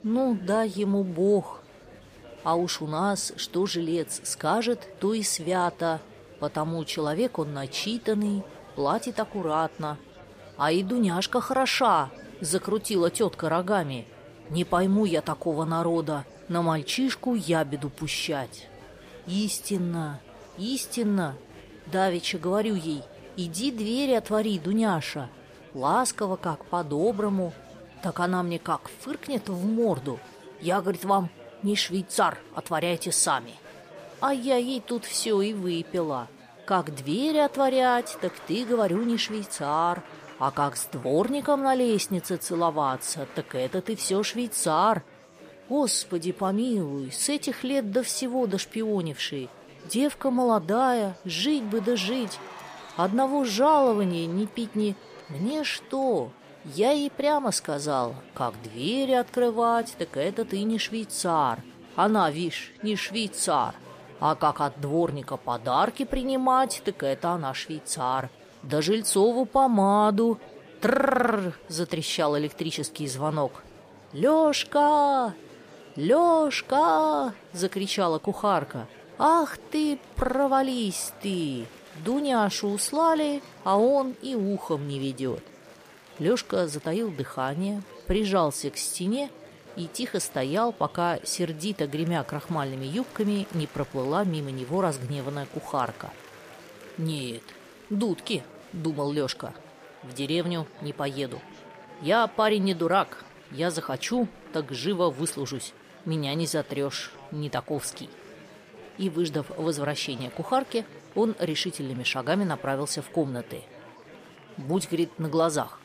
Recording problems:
murmuring crowd; faint; throughout; 20 dB below the speech

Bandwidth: 15 kHz